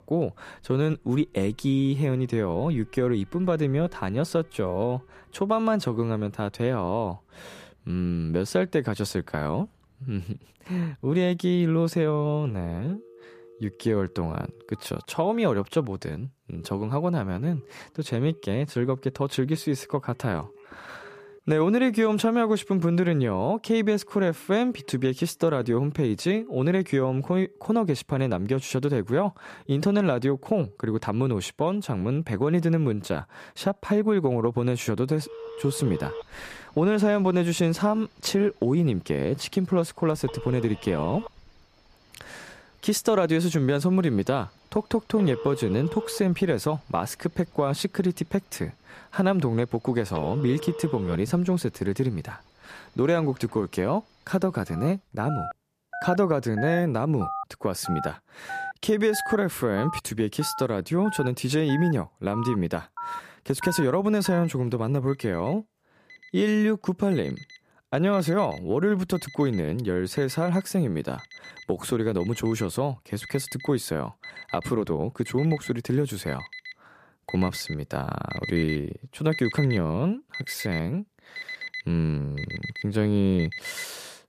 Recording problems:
alarms or sirens; noticeable; throughout; 15 dB below the speech

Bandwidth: 14.5 kHz